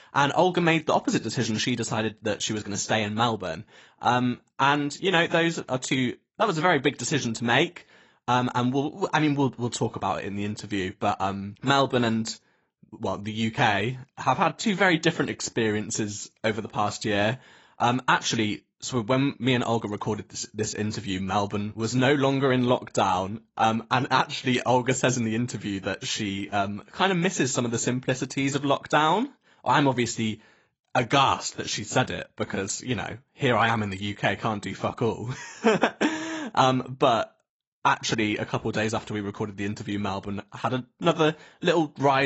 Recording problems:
garbled, watery; badly; nothing above 8 kHz
abrupt cut into speech; at the end

